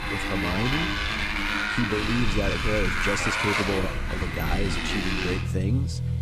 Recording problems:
traffic noise; very loud; throughout; 4 dB above the speech

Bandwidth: 15.5 kHz